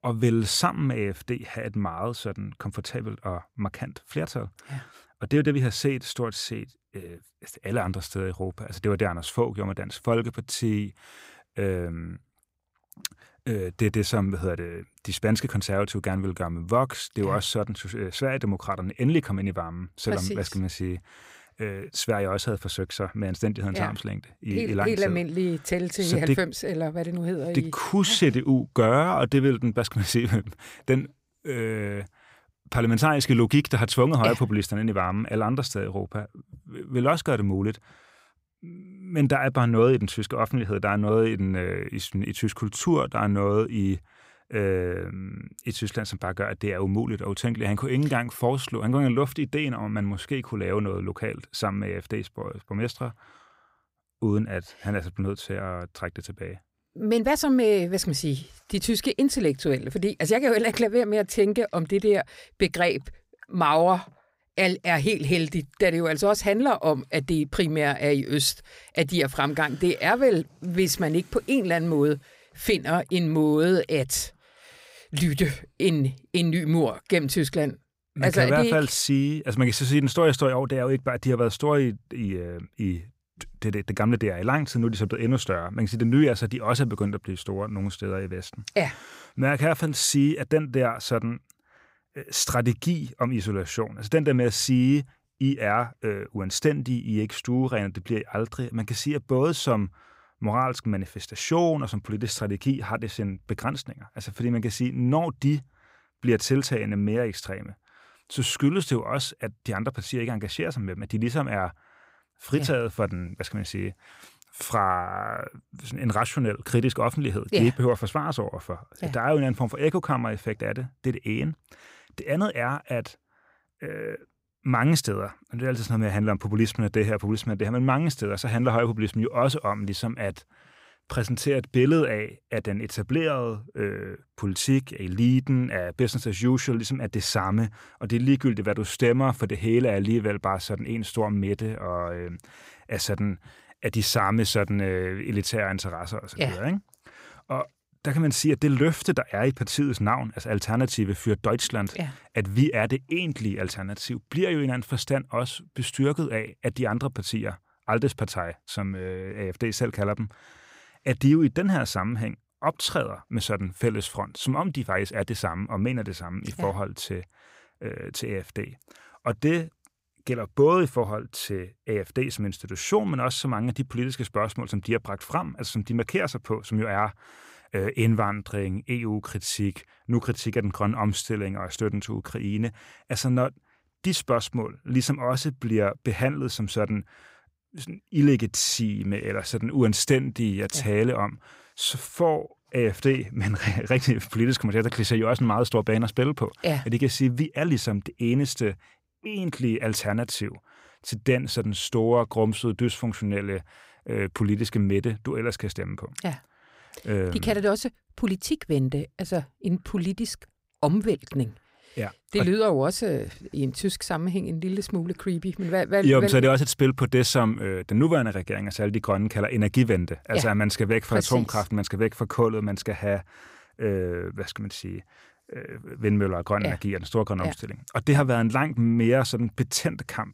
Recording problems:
none

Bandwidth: 15.5 kHz